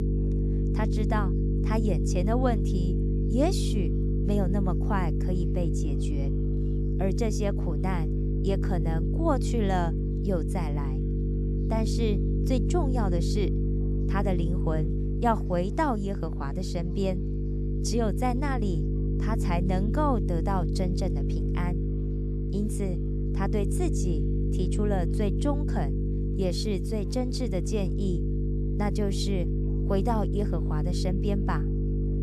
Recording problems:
electrical hum; loud; throughout; 50 Hz, 5 dB below the speech
chatter from many people; faint; throughout; 30 dB below the speech

